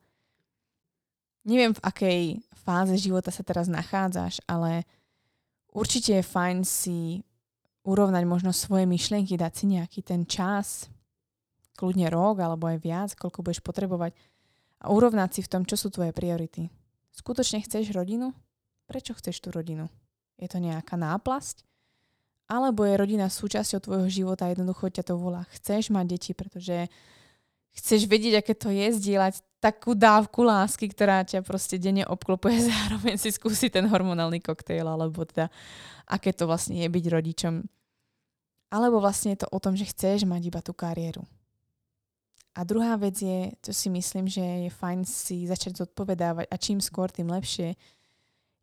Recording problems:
none

